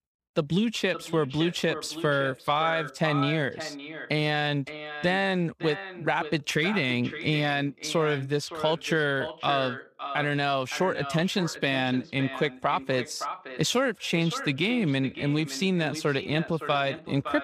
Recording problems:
echo of what is said; strong; throughout; 560 ms later, 10 dB below the speech

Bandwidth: 15 kHz